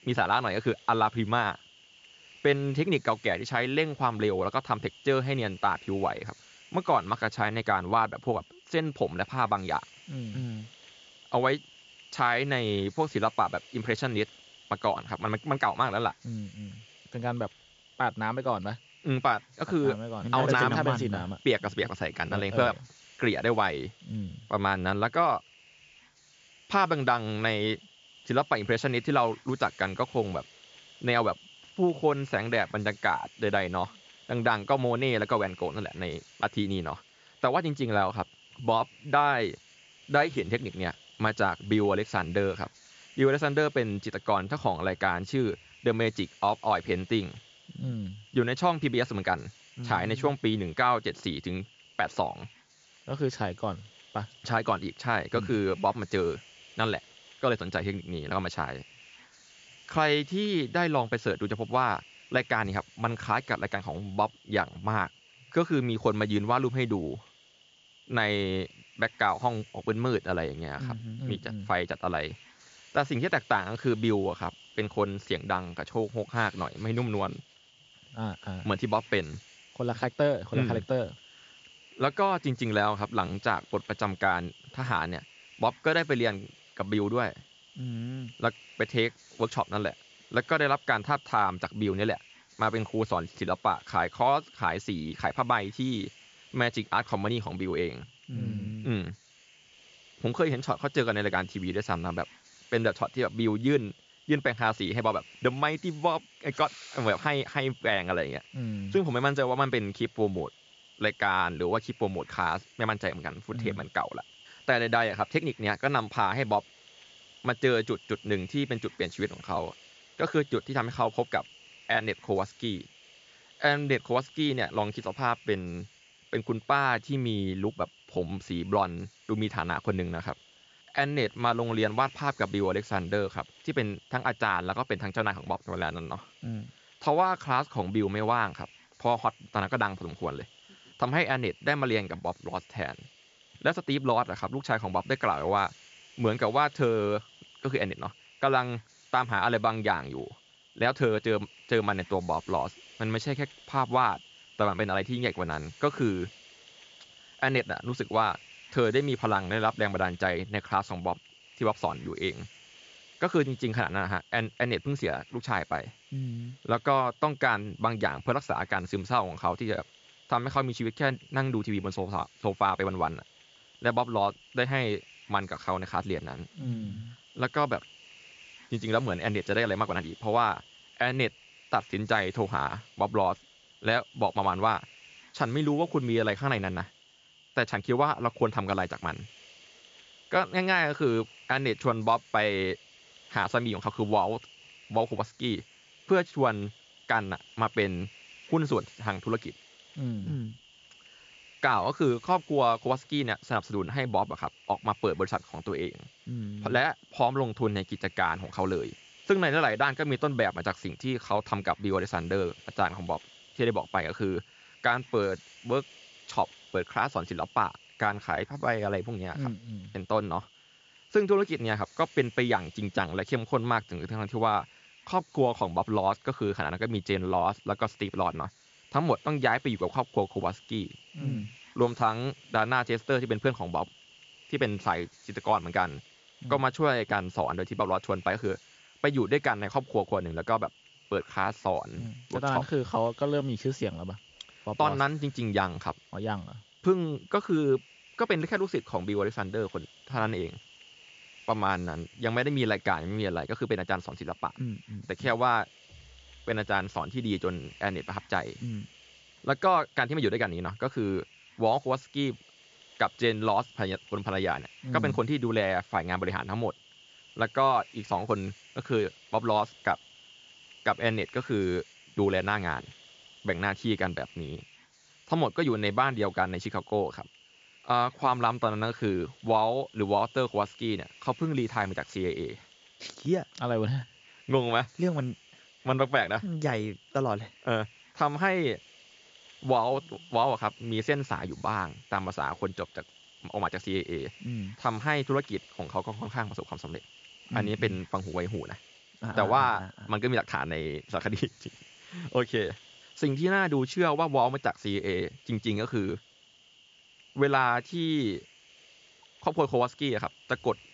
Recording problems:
high frequencies cut off; noticeable; nothing above 7.5 kHz
hiss; faint; throughout; 25 dB below the speech

